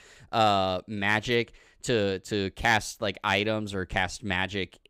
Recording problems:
none

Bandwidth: 15.5 kHz